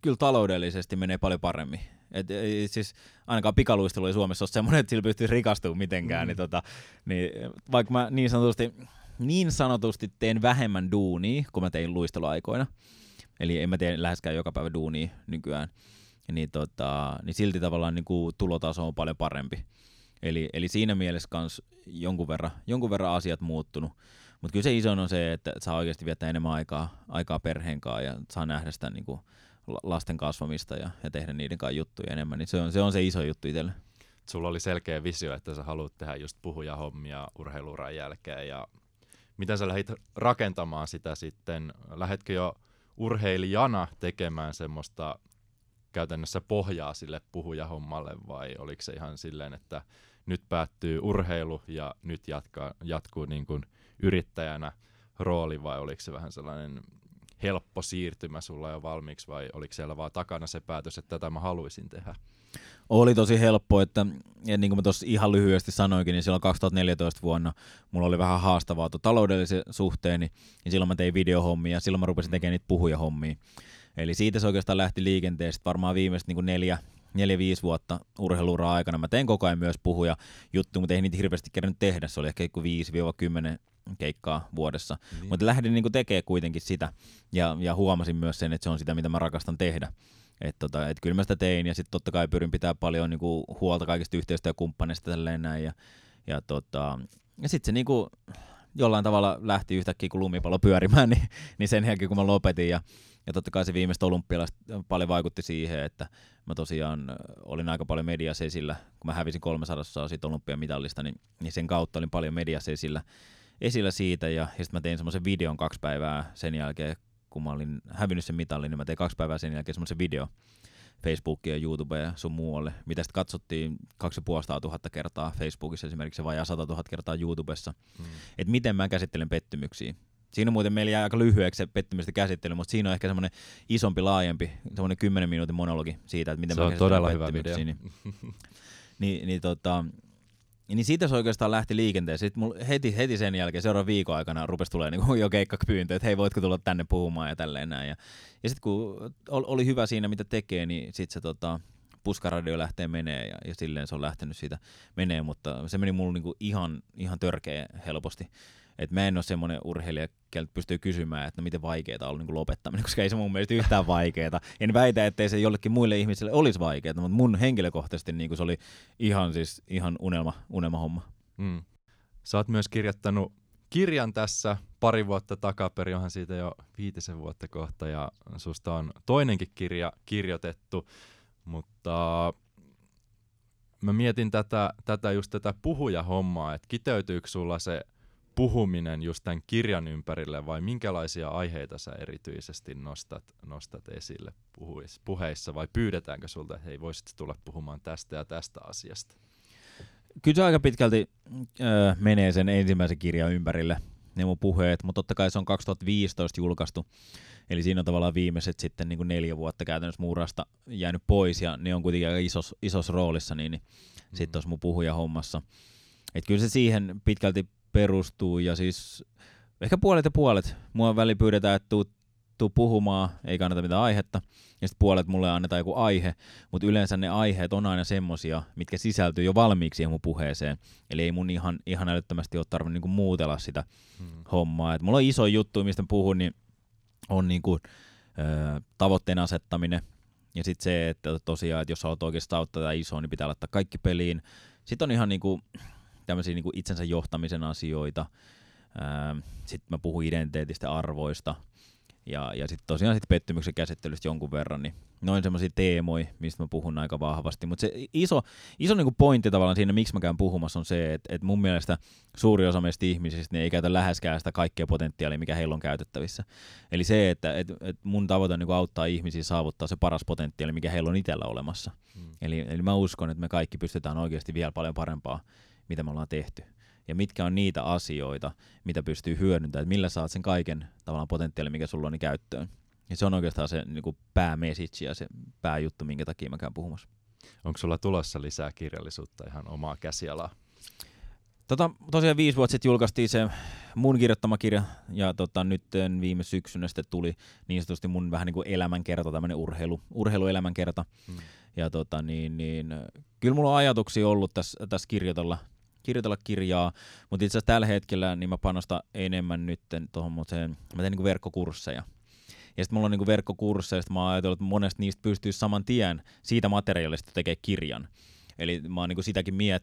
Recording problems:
none

